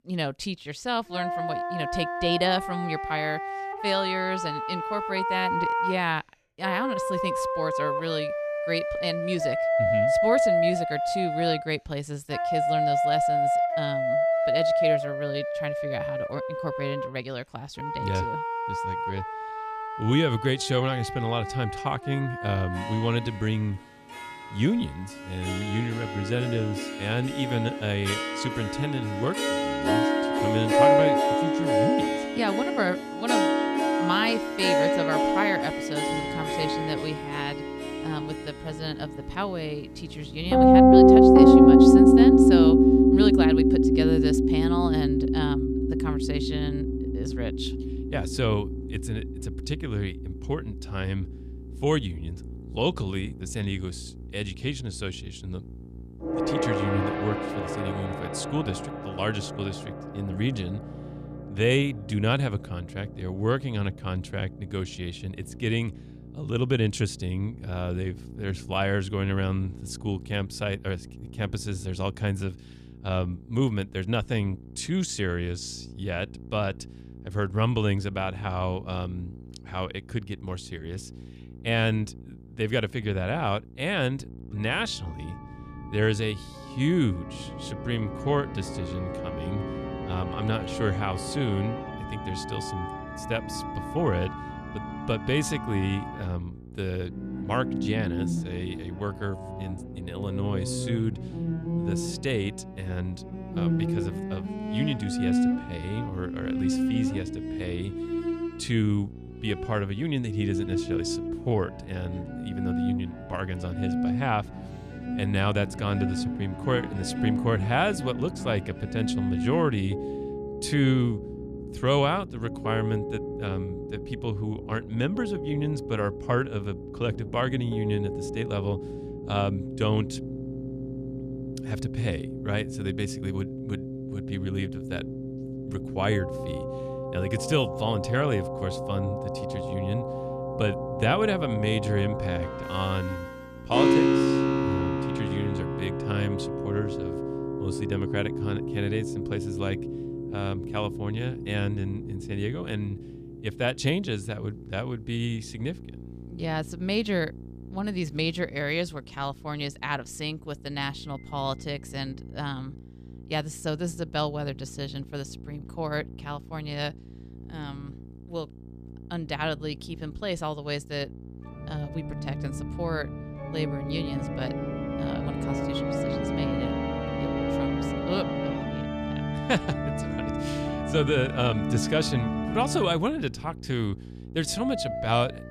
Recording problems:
background music; very loud; throughout; 4 dB above the speech
electrical hum; faint; from 36 s on; 60 Hz, 20 dB below the speech

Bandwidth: 14.5 kHz